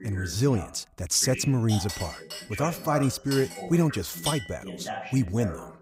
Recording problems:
voice in the background; noticeable; throughout; 10 dB below the speech
clattering dishes; noticeable; from 1.5 to 4.5 s; peak 5 dB below the speech

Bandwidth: 15.5 kHz